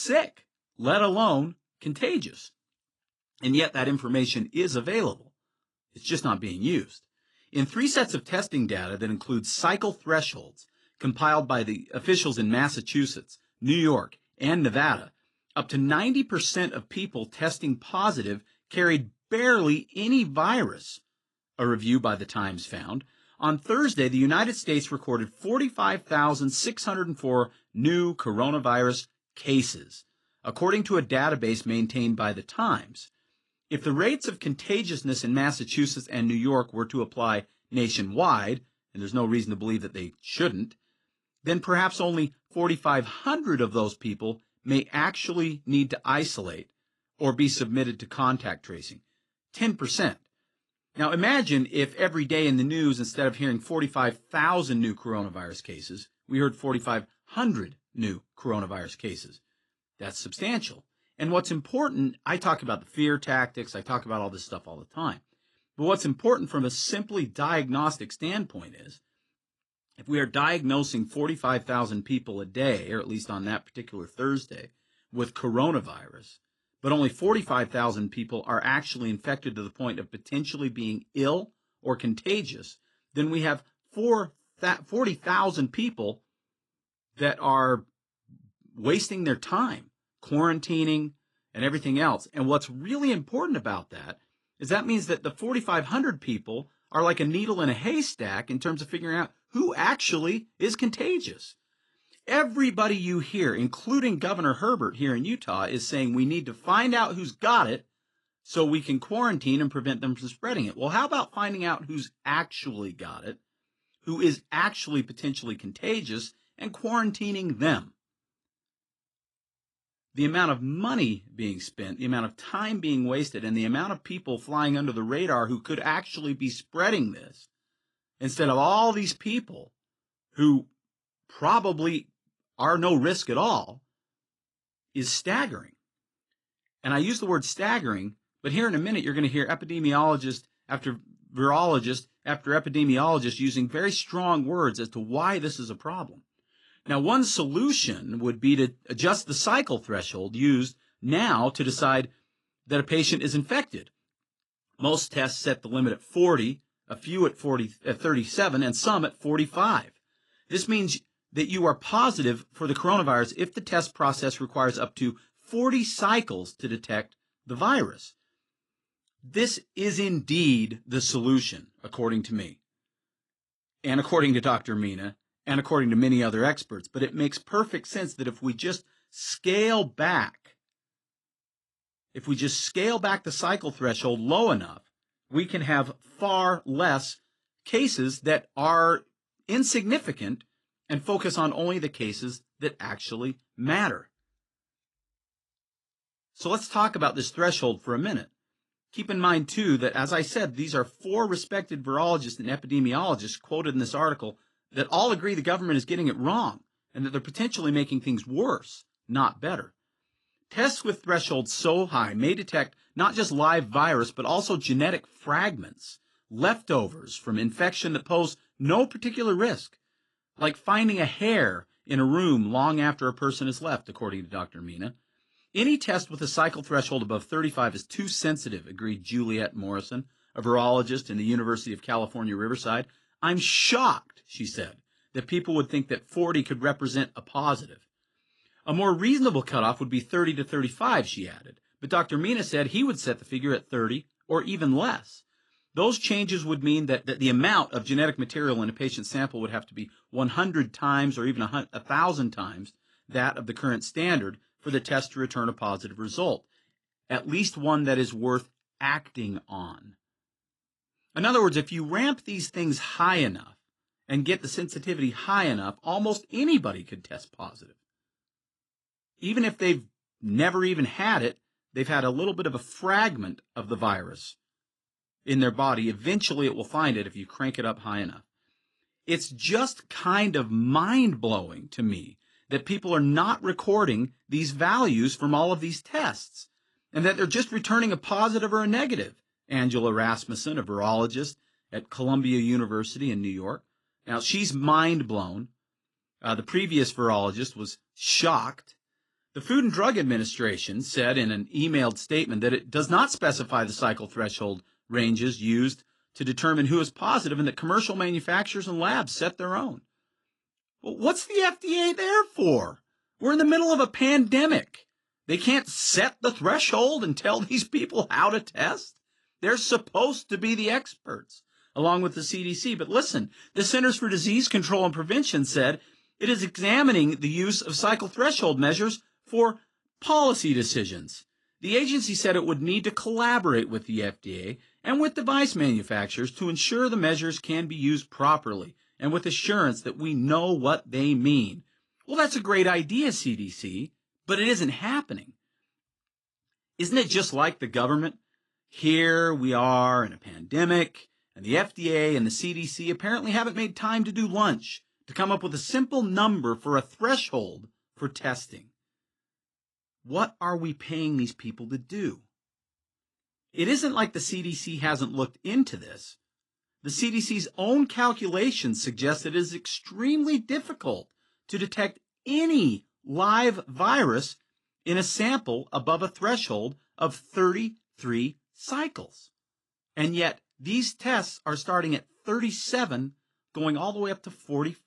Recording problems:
garbled, watery; slightly; nothing above 10 kHz
abrupt cut into speech; at the start

